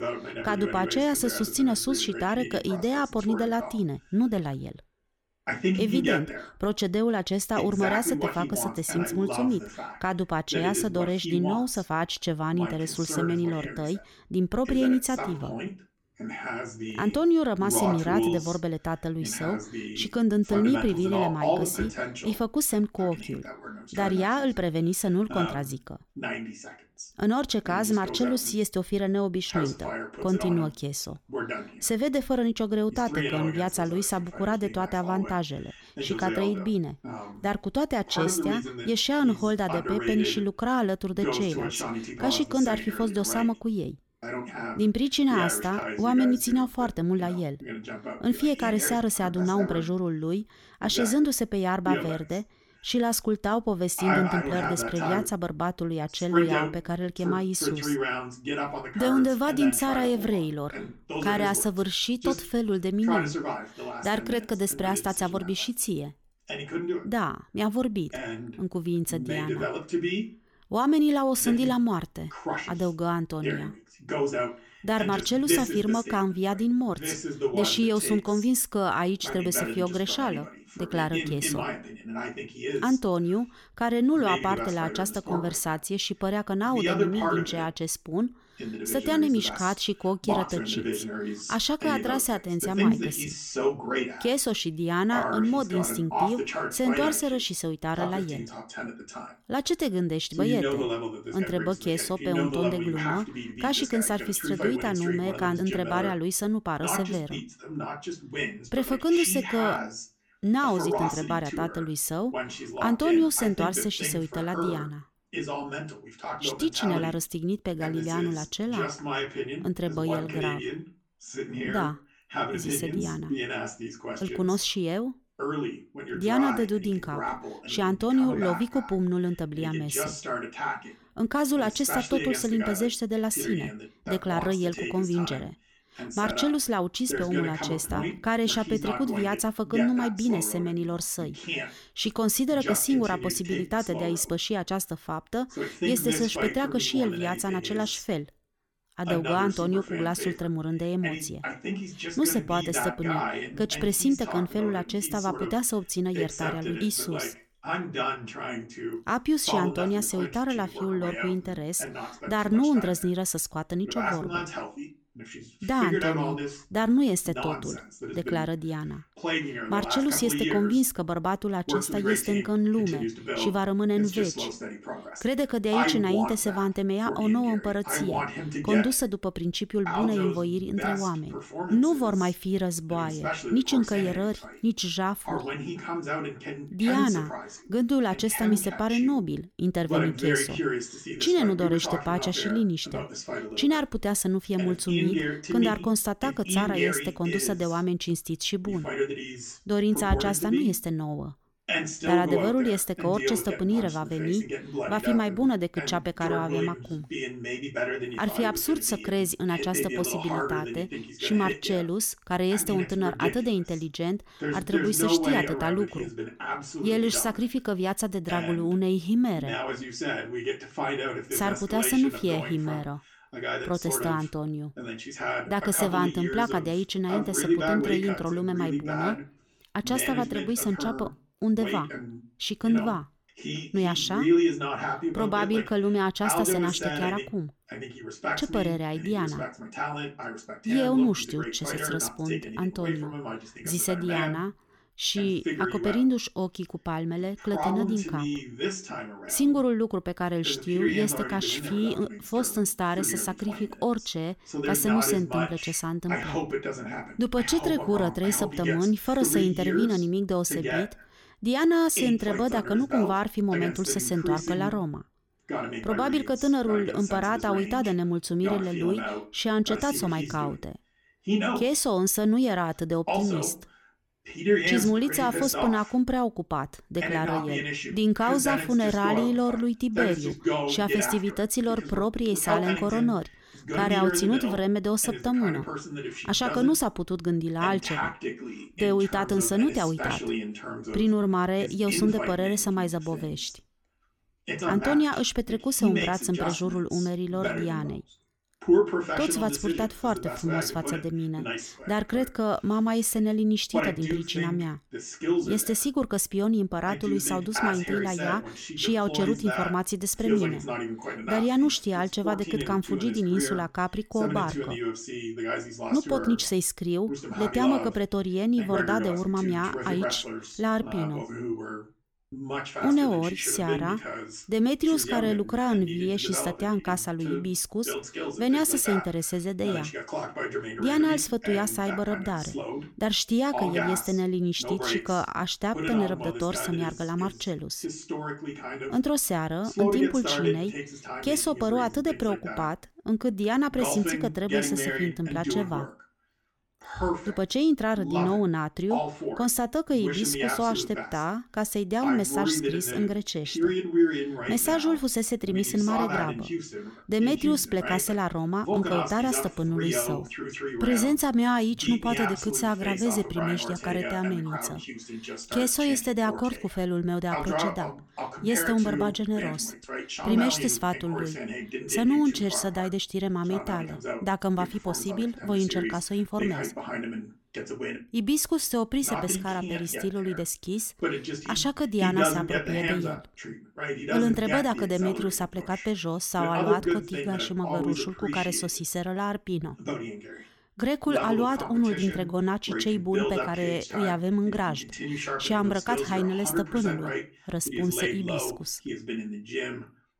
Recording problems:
voice in the background; loud; throughout; 5 dB below the speech

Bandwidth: 18 kHz